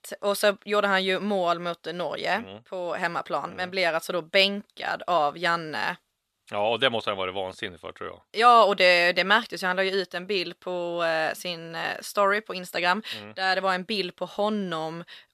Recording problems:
thin; very slightly; fading below 900 Hz

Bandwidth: 13.5 kHz